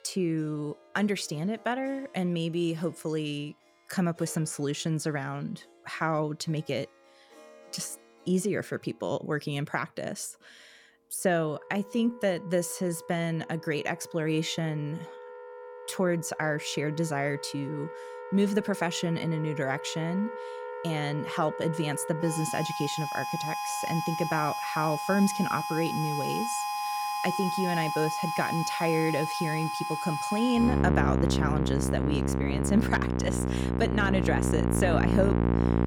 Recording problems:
background music; loud; throughout; 1 dB below the speech

